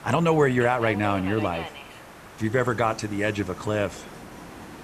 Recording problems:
train or aircraft noise; noticeable; throughout; 15 dB below the speech
hiss; faint; throughout; 25 dB below the speech

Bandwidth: 14 kHz